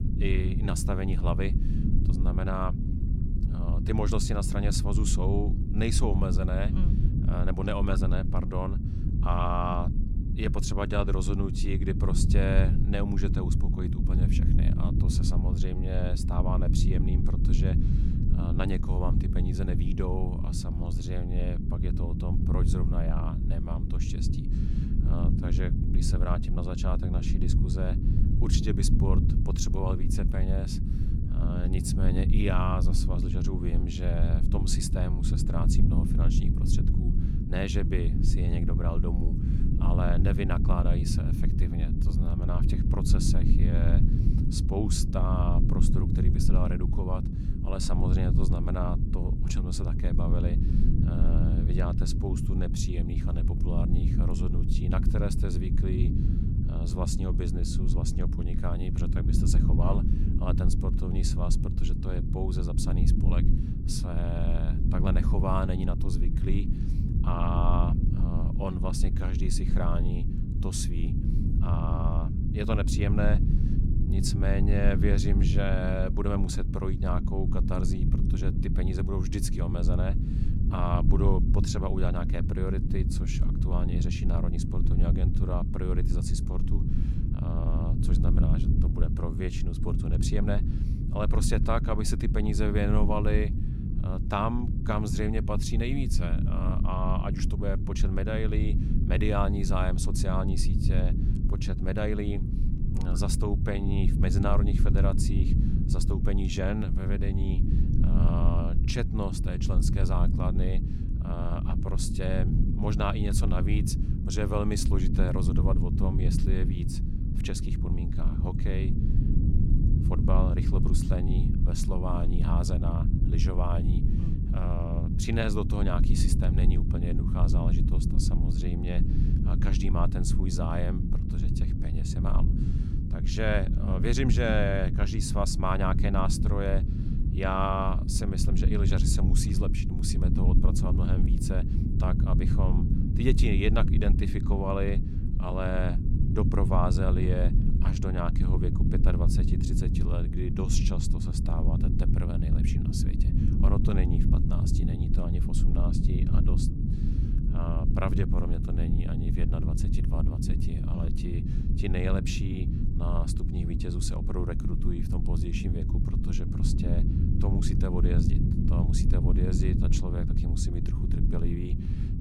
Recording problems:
low rumble; loud; throughout; 4 dB below the speech

